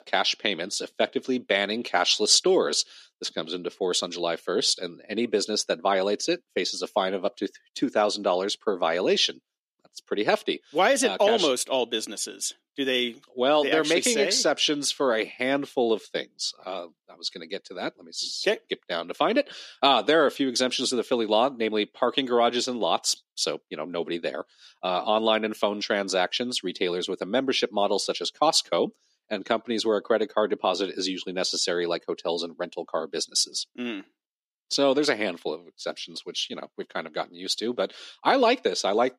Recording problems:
thin; somewhat; fading below 250 Hz

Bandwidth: 14.5 kHz